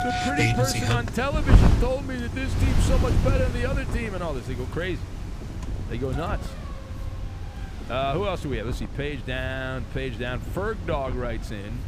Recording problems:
wind noise on the microphone; heavy; 8 dB below the speech
traffic noise; loud; throughout; 1 dB below the speech
train or aircraft noise; very faint; throughout; 30 dB below the speech

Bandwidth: 15 kHz